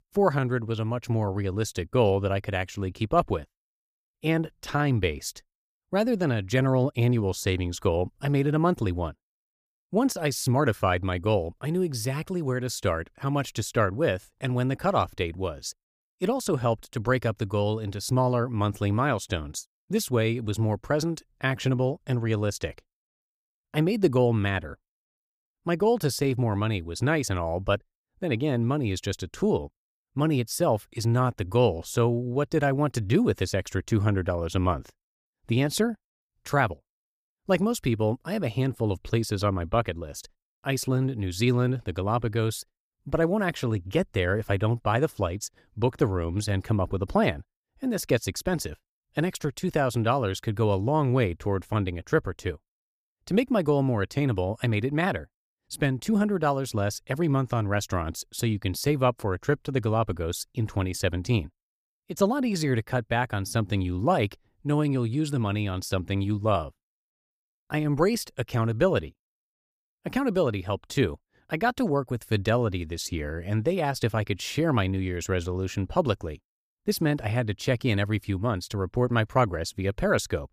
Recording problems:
none

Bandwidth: 15 kHz